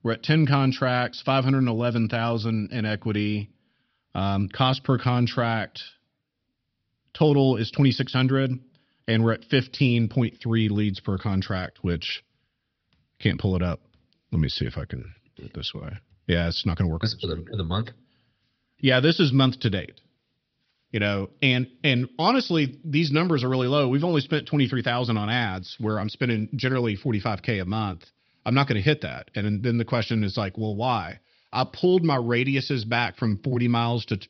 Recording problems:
high frequencies cut off; noticeable; nothing above 5.5 kHz

